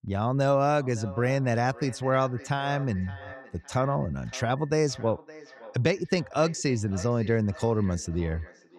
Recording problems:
echo of what is said; faint; throughout; 560 ms later, 20 dB below the speech

